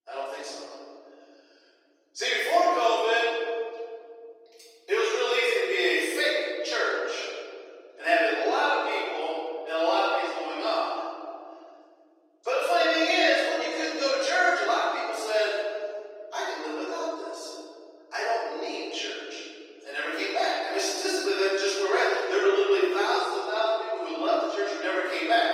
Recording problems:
room echo; strong; dies away in 2.4 s
off-mic speech; far
thin; very; fading below 300 Hz
garbled, watery; slightly; nothing above 16.5 kHz

